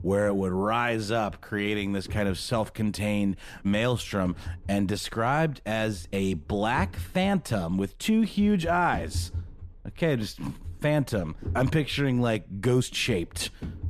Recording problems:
low rumble; faint; throughout; 25 dB below the speech

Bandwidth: 14.5 kHz